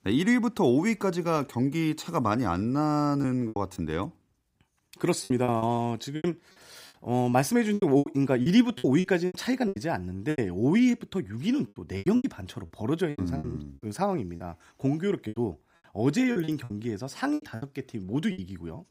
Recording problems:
choppy; very; 10% of the speech affected

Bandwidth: 15.5 kHz